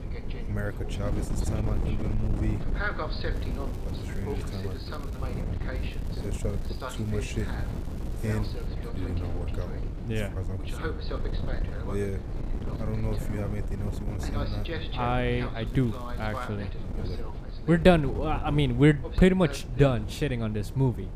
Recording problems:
voice in the background; noticeable; throughout; 10 dB below the speech
wind noise on the microphone; occasional gusts; 15 dB below the speech
crackling; faint; from 3.5 to 5.5 s, from 6 to 8.5 s and at 16 s; 25 dB below the speech

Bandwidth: 15 kHz